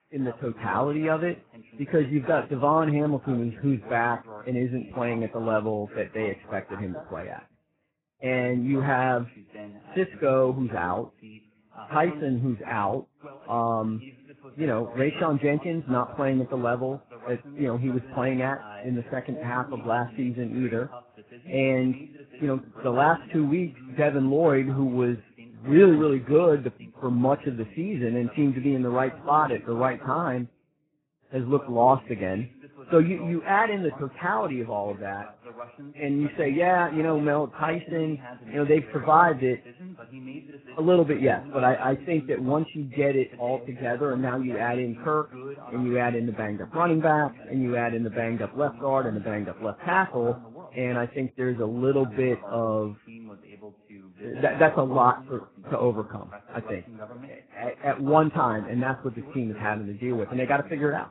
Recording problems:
garbled, watery; badly; nothing above 4 kHz
voice in the background; noticeable; throughout; 20 dB below the speech

